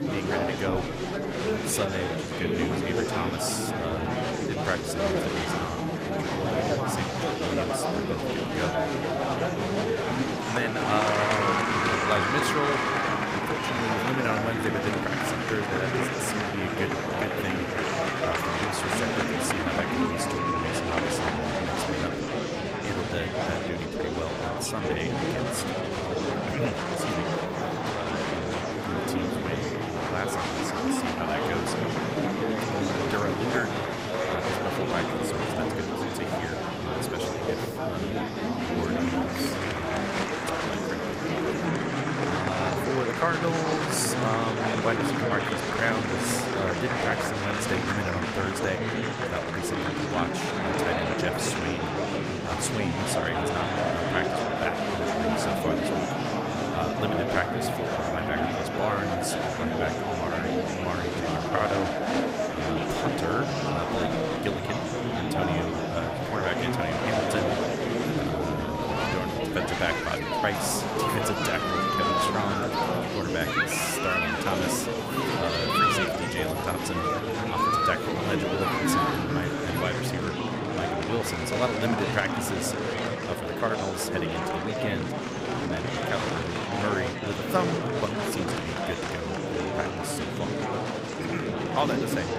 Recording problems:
murmuring crowd; very loud; throughout; 5 dB above the speech
high-pitched whine; faint; until 20 s, from 29 to 42 s and from 55 s to 1:20; 11.5 kHz, 30 dB below the speech

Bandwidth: 15.5 kHz